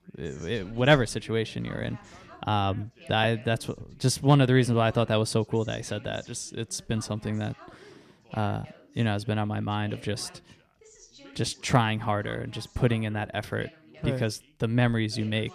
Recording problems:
background chatter; faint; throughout; 2 voices, 25 dB below the speech

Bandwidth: 14.5 kHz